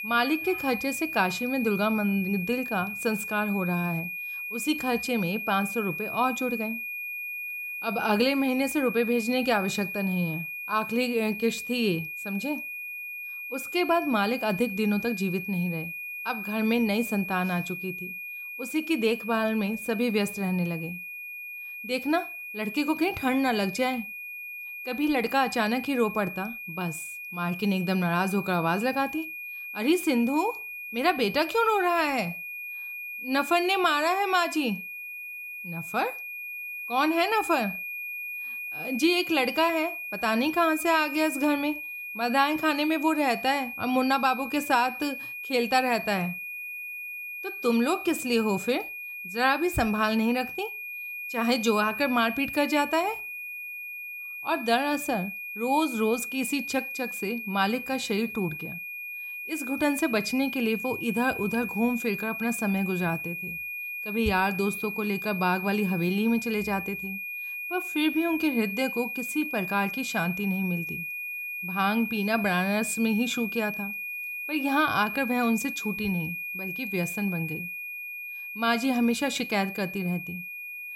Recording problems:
high-pitched whine; loud; throughout; 2.5 kHz, 7 dB below the speech

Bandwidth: 16 kHz